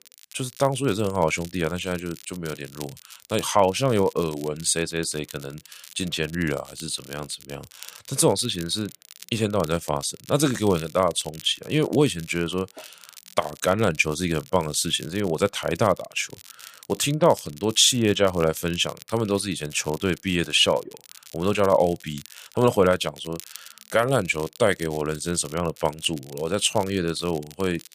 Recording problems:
crackle, like an old record; faint; 20 dB below the speech

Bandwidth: 15 kHz